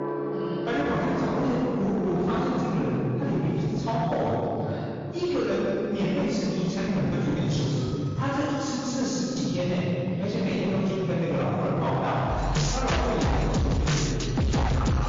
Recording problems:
distortion; heavy; 19% of the sound clipped
room echo; strong; dies away in 2.6 s
off-mic speech; far
garbled, watery; slightly; nothing above 6.5 kHz
background music; loud; throughout; 4 dB below the speech
alarms or sirens; very faint; throughout; 25 dB below the speech
choppy; very; from 7 to 9.5 s; 8% of the speech affected

